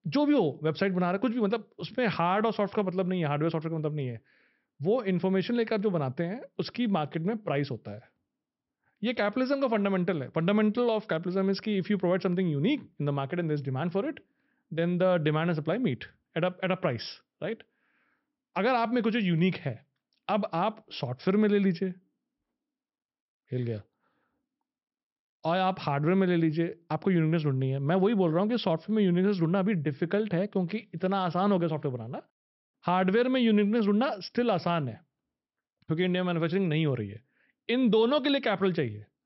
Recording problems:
high frequencies cut off; noticeable; nothing above 5.5 kHz

